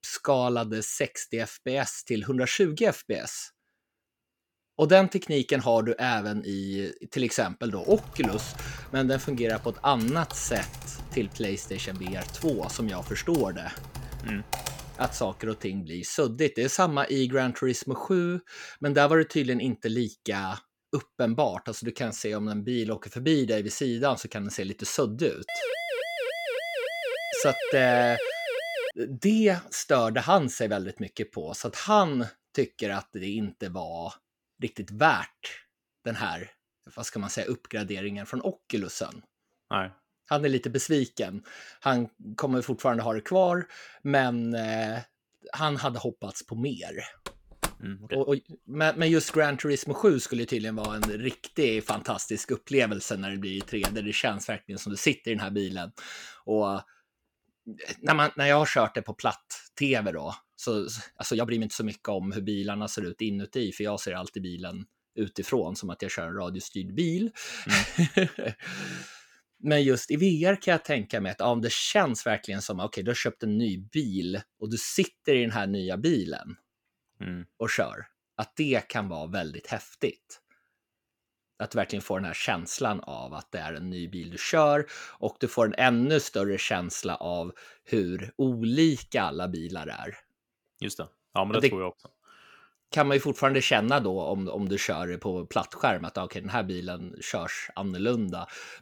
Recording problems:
keyboard typing; noticeable; from 8 to 15 s; peak 6 dB below the speech
uneven, jittery; strongly; from 22 s to 1:34
siren; noticeable; from 25 to 29 s; peak 2 dB below the speech
door banging; noticeable; from 47 to 54 s; peak 6 dB below the speech

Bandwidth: 18.5 kHz